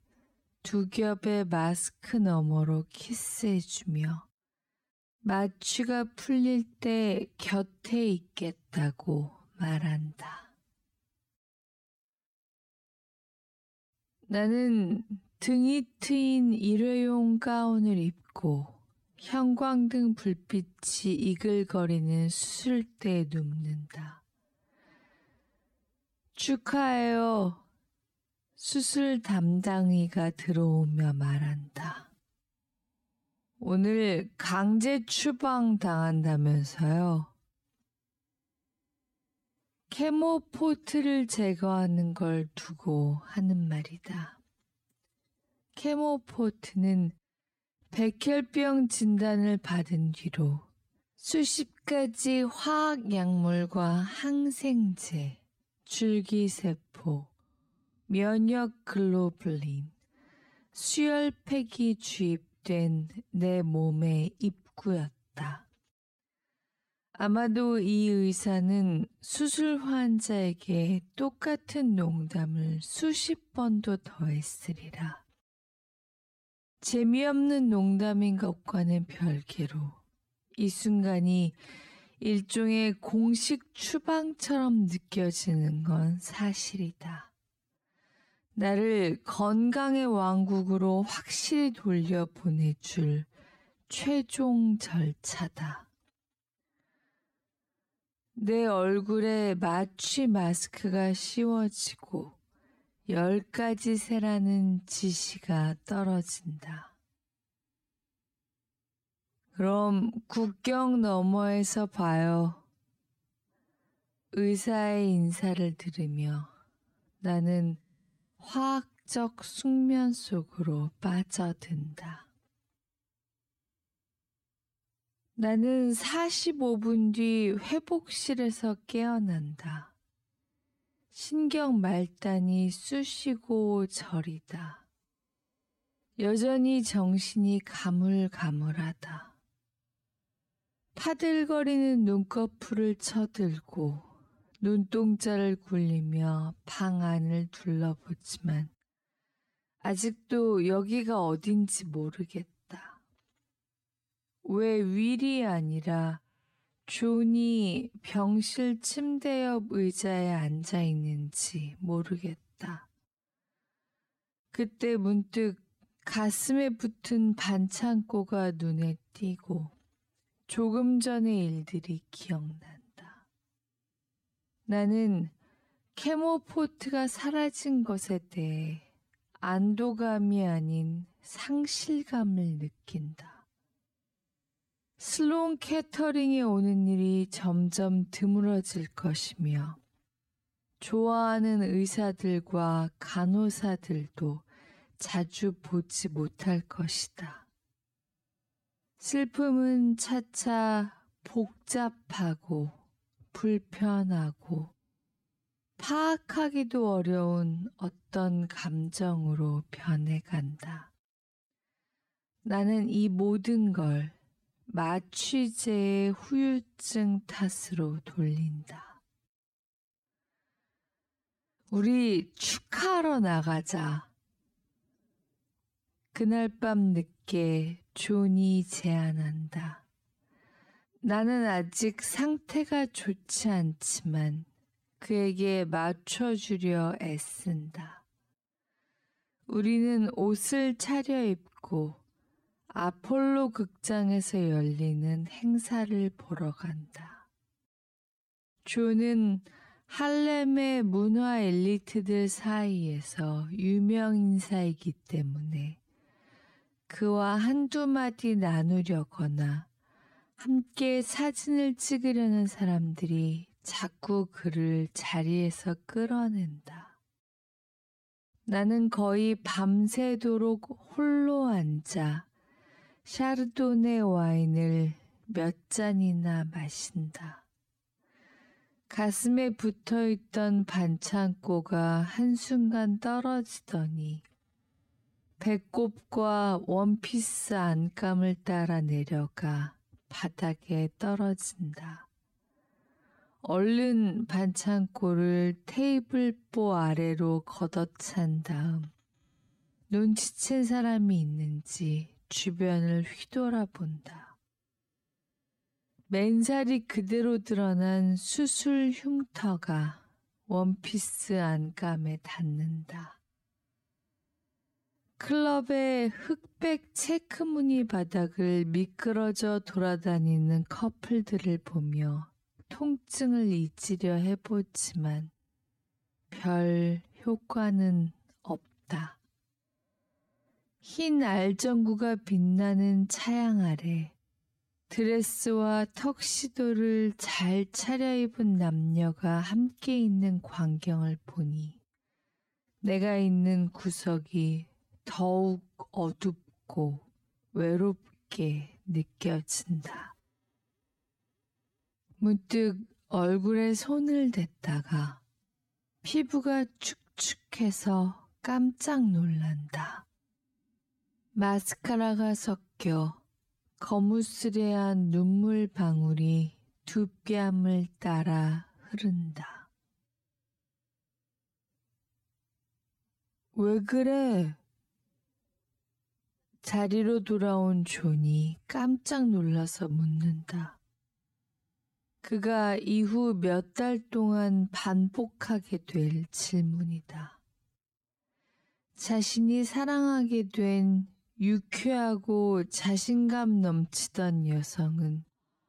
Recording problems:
wrong speed, natural pitch; too slow; 0.6 times normal speed

